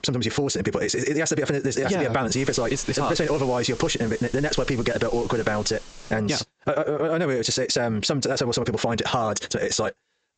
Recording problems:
squashed, flat; heavily
wrong speed, natural pitch; too fast; 1.8 times normal speed
high frequencies cut off; noticeable; nothing above 8 kHz
hiss; noticeable; from 2.5 to 6 s; 20 dB below the speech

